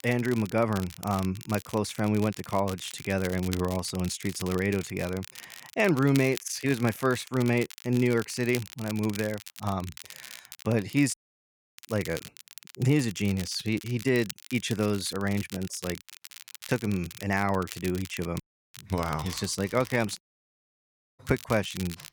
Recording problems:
crackle, like an old record; noticeable; 15 dB below the speech
audio cutting out; at 11 s for 0.5 s, at 18 s and at 20 s for 1 s

